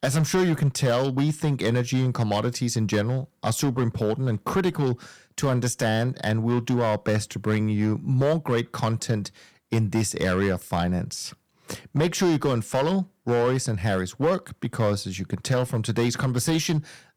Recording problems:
distortion; slight; 6% of the sound clipped

